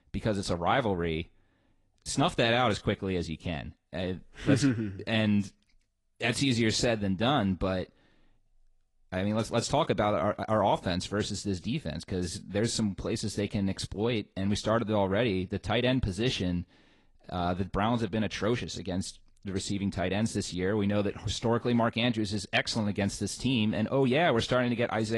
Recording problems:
garbled, watery; slightly; nothing above 10.5 kHz
abrupt cut into speech; at the end

